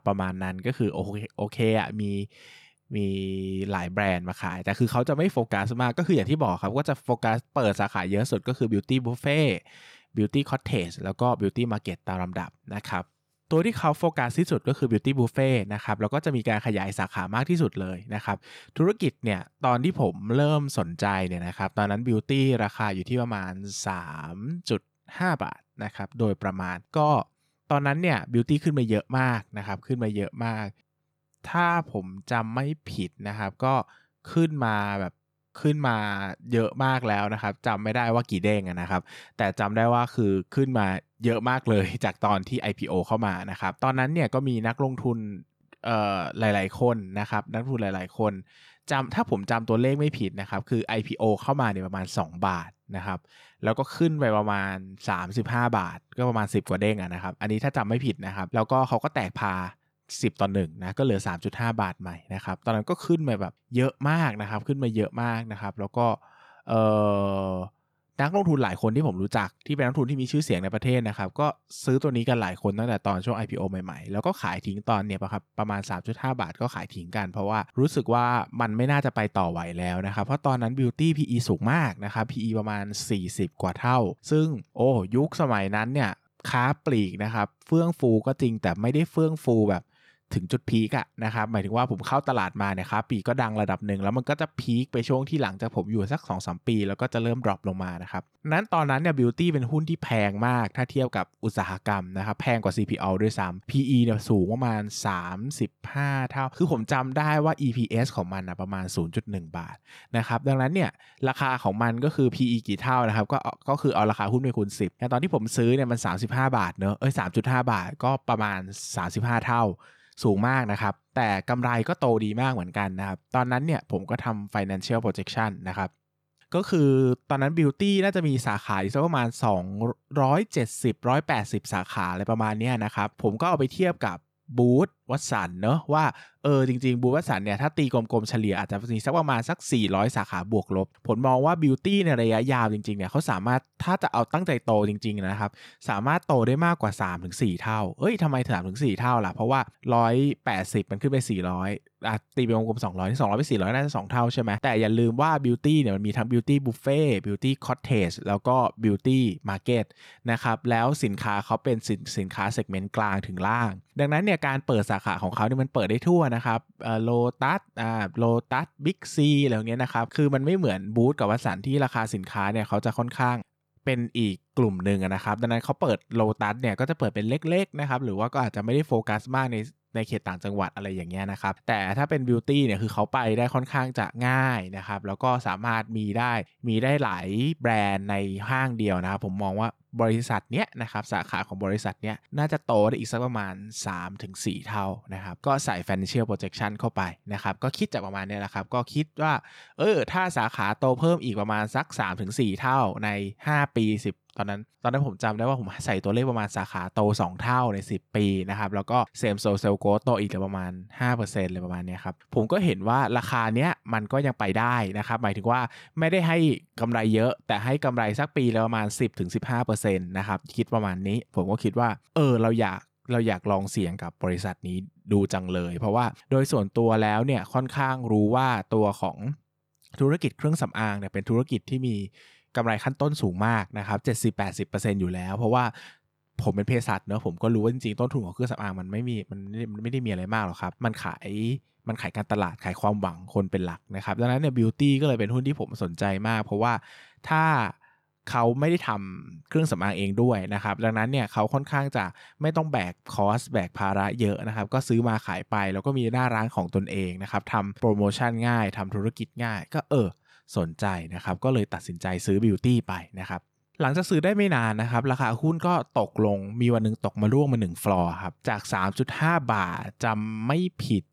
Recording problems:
none

